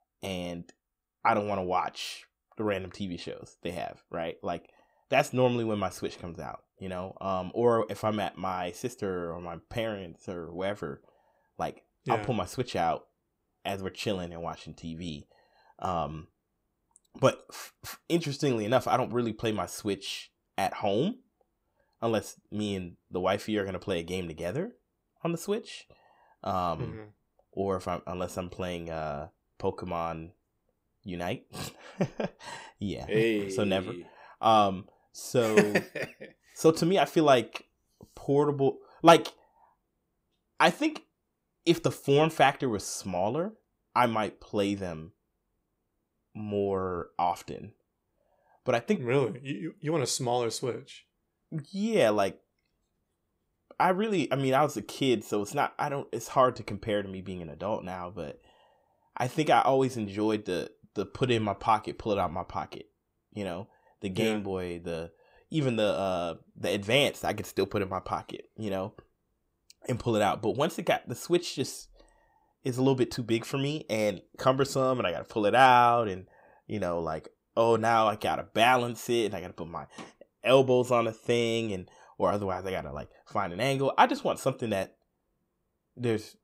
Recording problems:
none

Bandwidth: 15.5 kHz